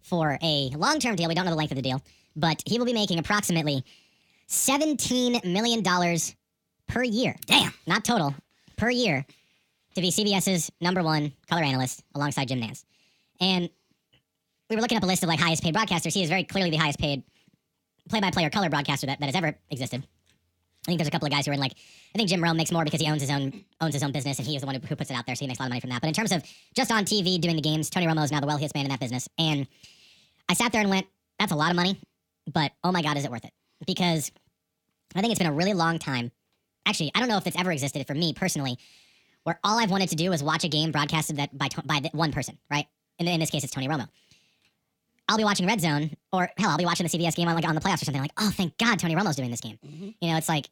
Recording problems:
wrong speed and pitch; too fast and too high; 1.5 times normal speed

